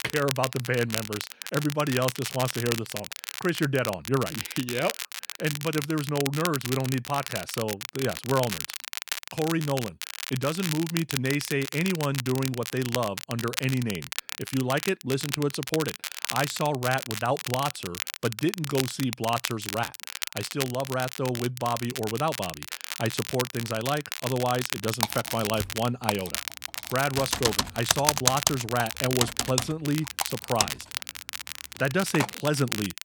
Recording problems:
crackle, like an old record; loud; 5 dB below the speech
keyboard typing; loud; from 25 to 32 s; peak 7 dB above the speech

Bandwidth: 18.5 kHz